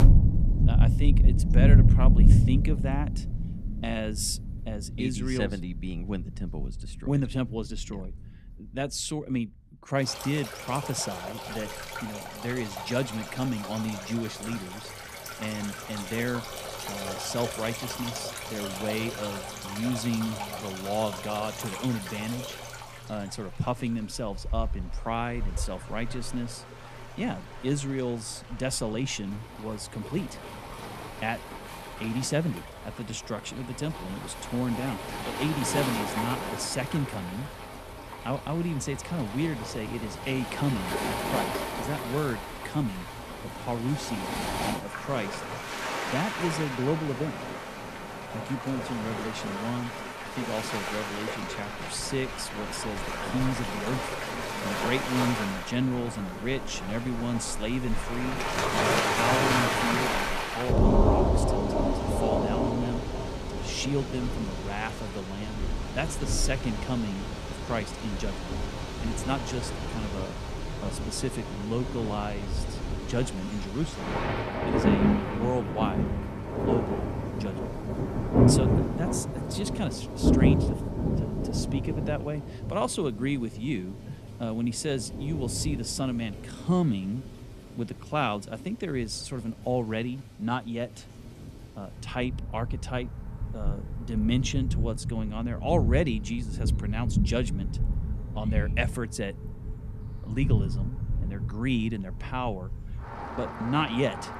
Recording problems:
rain or running water; very loud; throughout; 2 dB above the speech

